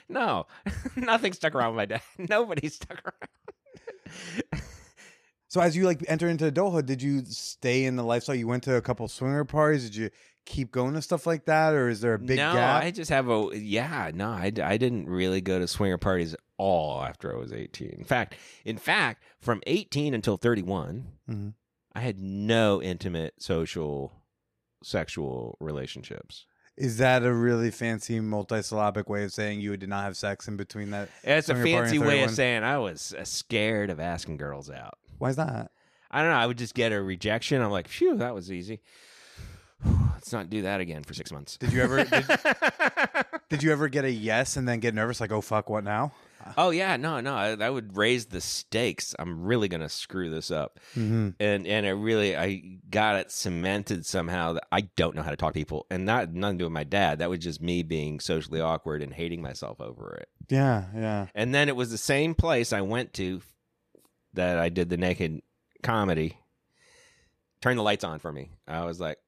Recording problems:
uneven, jittery; strongly; from 1.5 s to 1:08

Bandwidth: 14.5 kHz